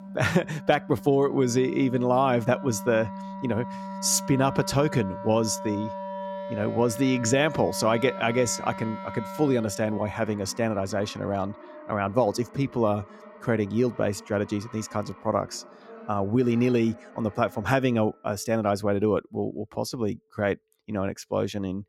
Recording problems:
background music; noticeable; throughout; 15 dB below the speech

